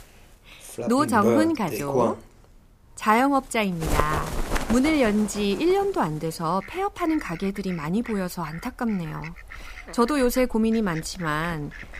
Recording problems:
animal sounds; loud; throughout; 7 dB below the speech

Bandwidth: 15 kHz